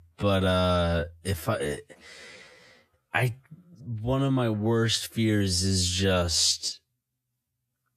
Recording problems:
wrong speed, natural pitch; too slow; 0.6 times normal speed

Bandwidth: 14.5 kHz